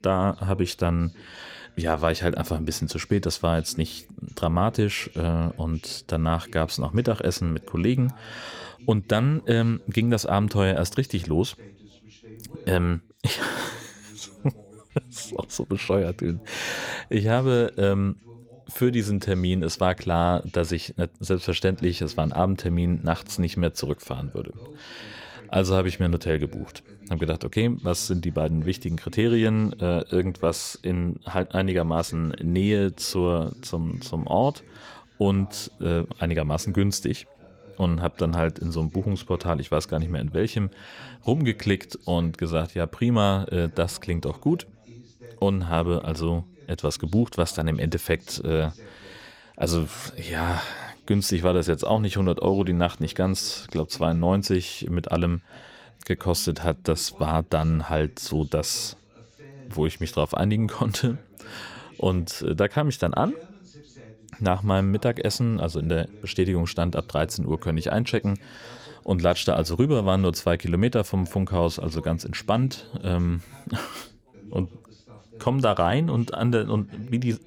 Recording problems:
background chatter; faint; throughout; 2 voices, 25 dB below the speech

